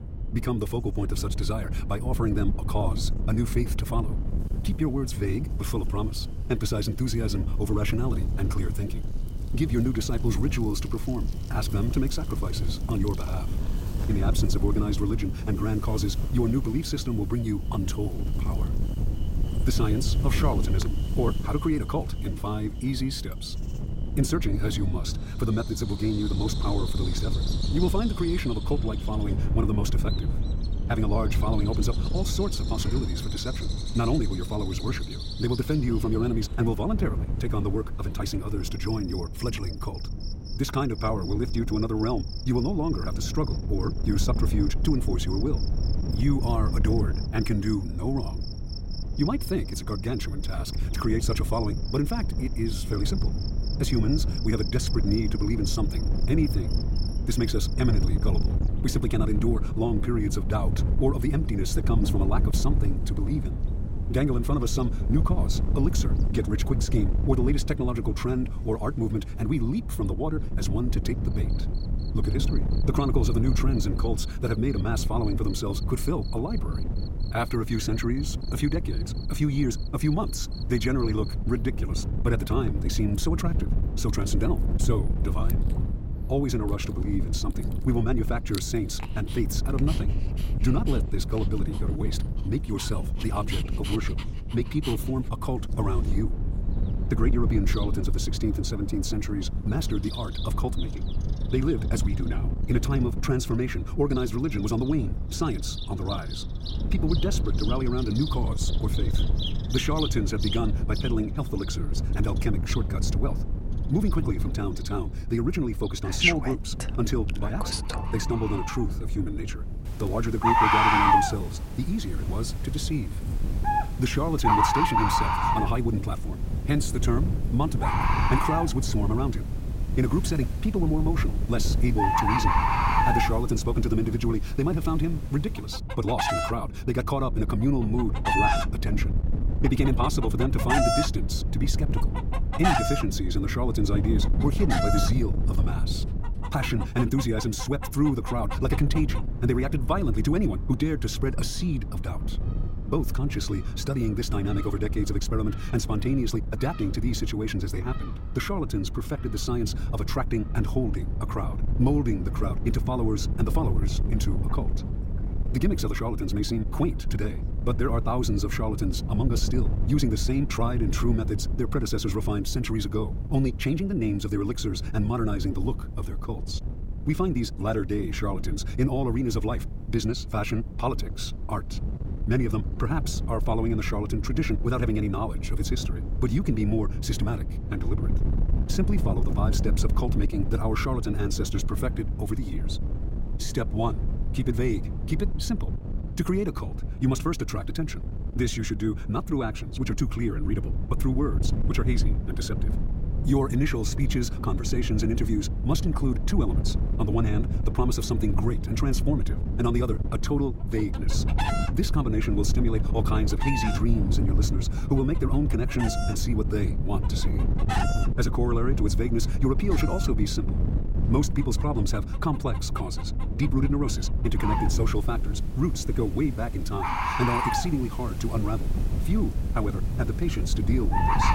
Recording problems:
wrong speed, natural pitch; too fast; 1.6 times normal speed
animal sounds; loud; throughout; 3 dB below the speech
wind noise on the microphone; occasional gusts; 10 dB below the speech

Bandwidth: 16 kHz